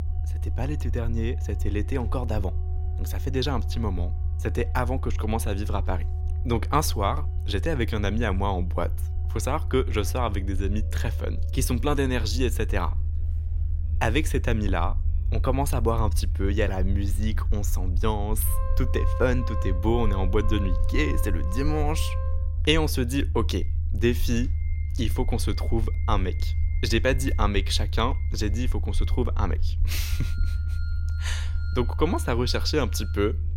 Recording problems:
background music; noticeable; throughout; 20 dB below the speech
low rumble; noticeable; throughout; 15 dB below the speech

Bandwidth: 16 kHz